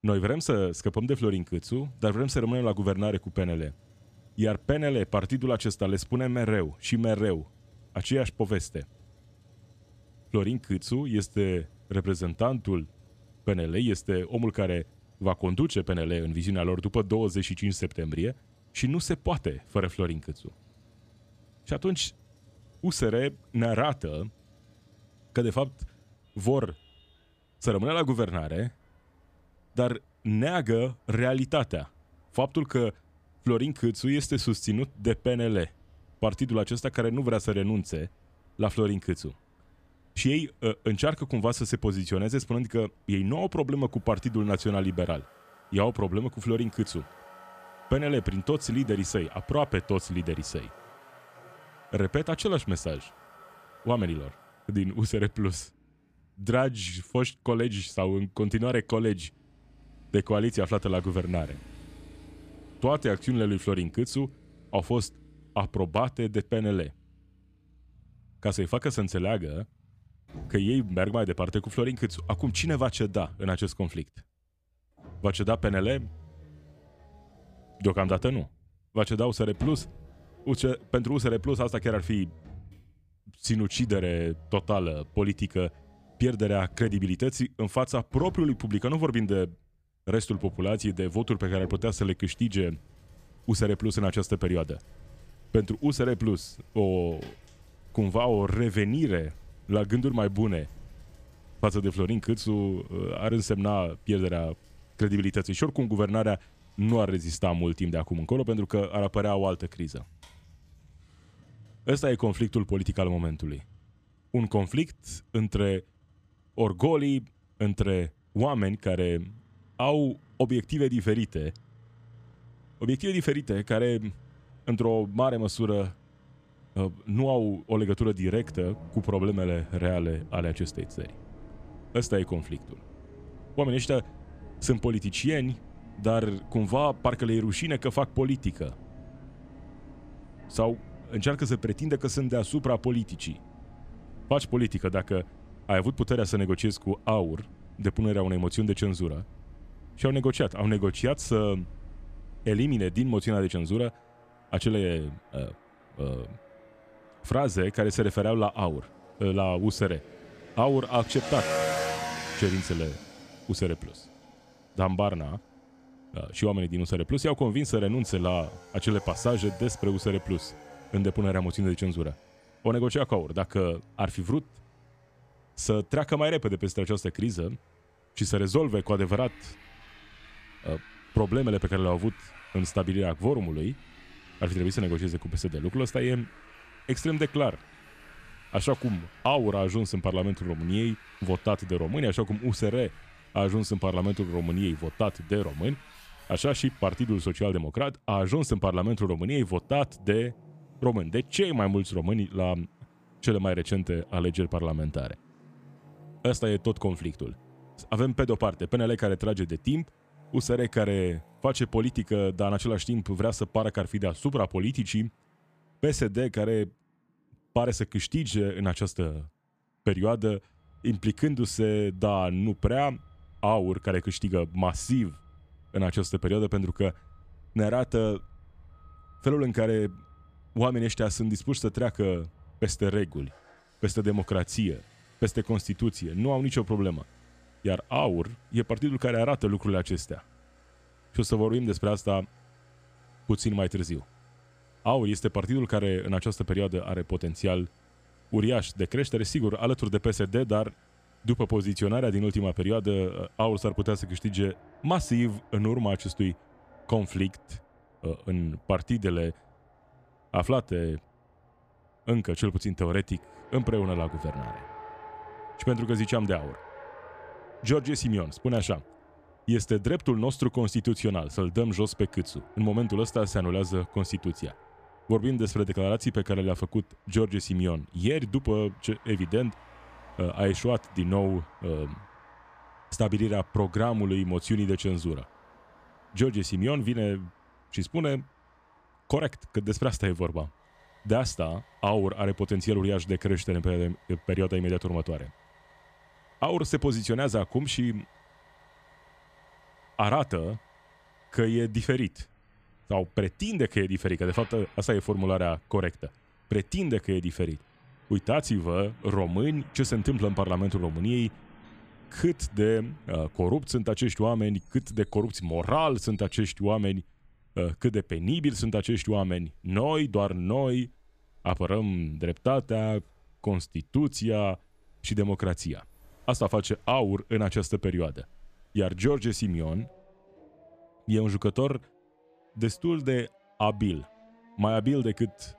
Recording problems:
traffic noise; faint; throughout; 20 dB below the speech

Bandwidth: 14.5 kHz